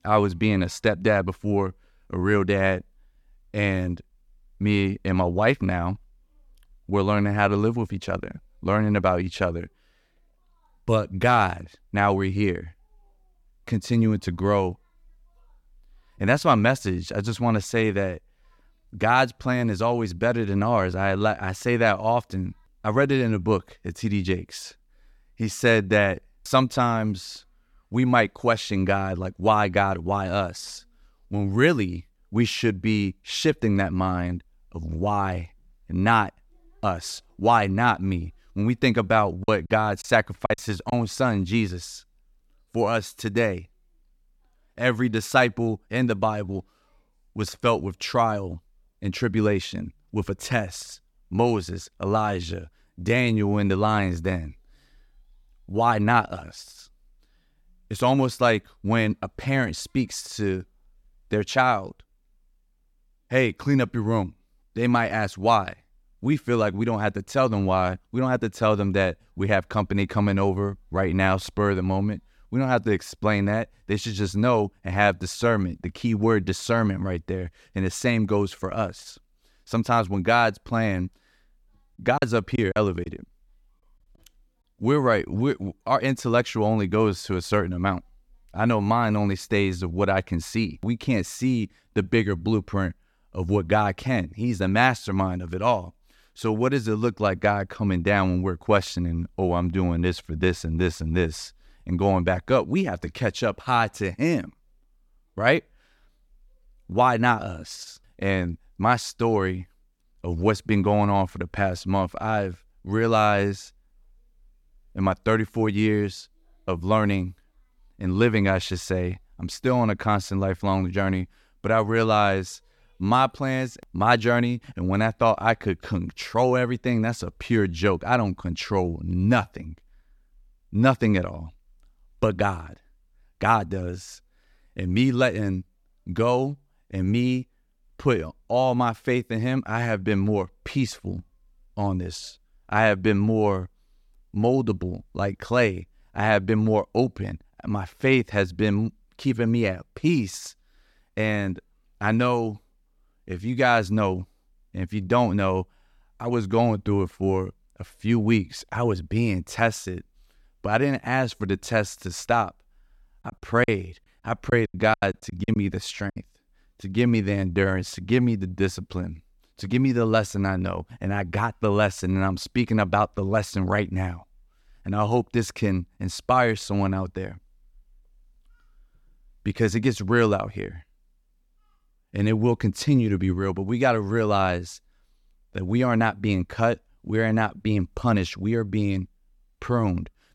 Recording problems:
choppy; very; from 39 to 41 s, at 1:22 and from 2:43 to 2:46; 14% of the speech affected

